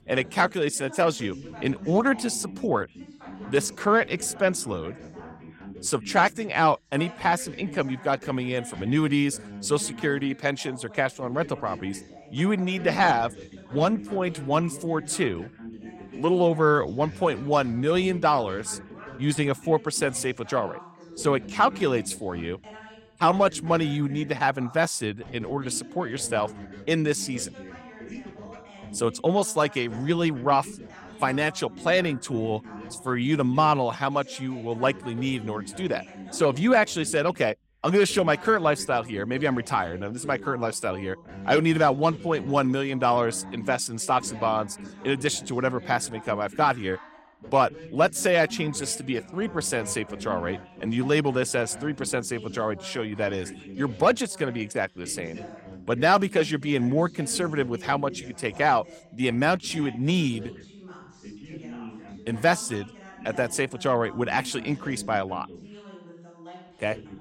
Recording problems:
background chatter; noticeable; throughout; 2 voices, 15 dB below the speech

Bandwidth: 16 kHz